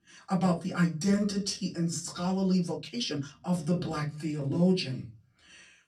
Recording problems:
off-mic speech; far
room echo; very slight; dies away in 0.3 s
uneven, jittery; strongly; from 1 to 4.5 s

